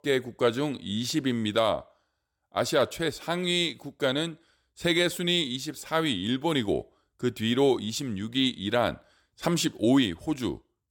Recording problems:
none

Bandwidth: 17.5 kHz